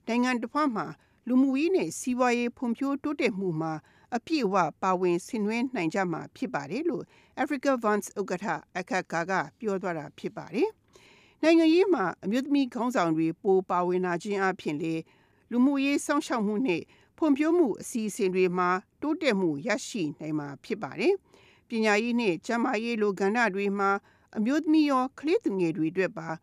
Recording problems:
none

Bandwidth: 14.5 kHz